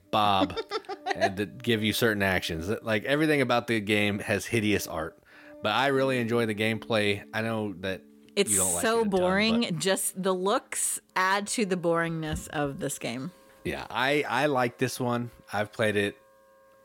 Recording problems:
background music; faint; throughout; 25 dB below the speech

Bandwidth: 16.5 kHz